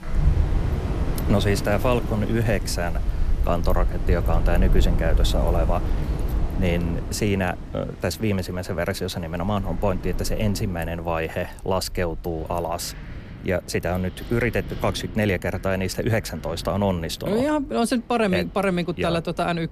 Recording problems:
wind in the background; loud; throughout; 4 dB below the speech

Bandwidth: 14 kHz